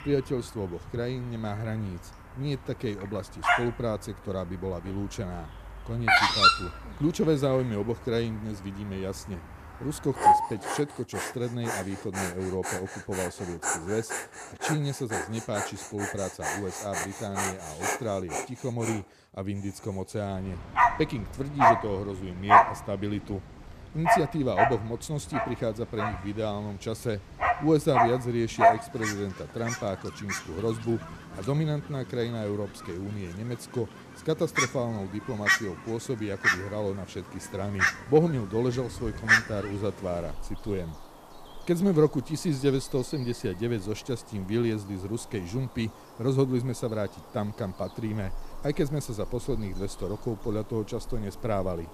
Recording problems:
animal sounds; very loud; throughout; 4 dB above the speech

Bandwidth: 14.5 kHz